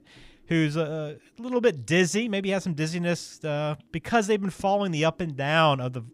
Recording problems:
none

